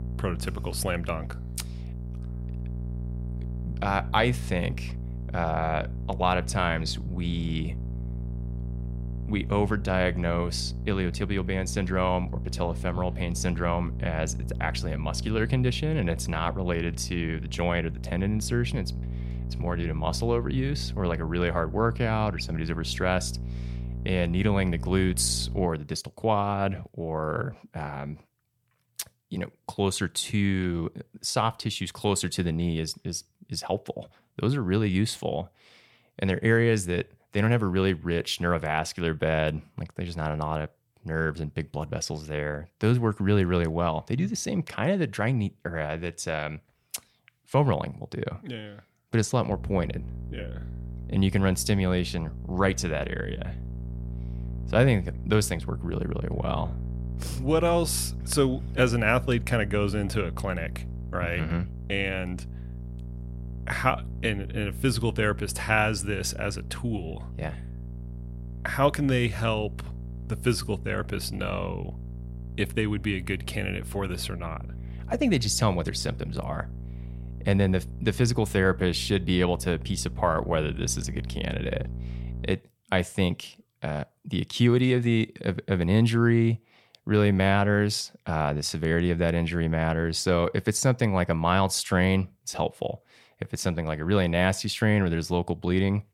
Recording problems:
electrical hum; noticeable; until 26 s and from 50 s to 1:23; 60 Hz, 20 dB below the speech

